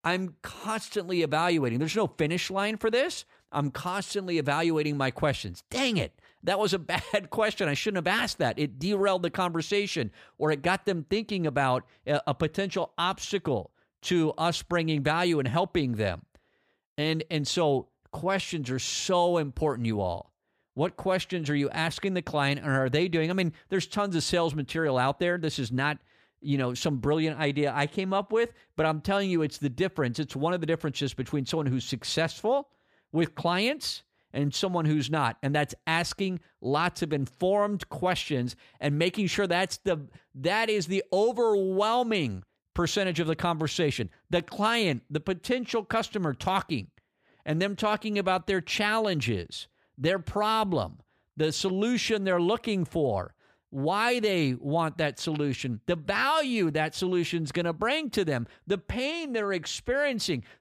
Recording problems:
none

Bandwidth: 15 kHz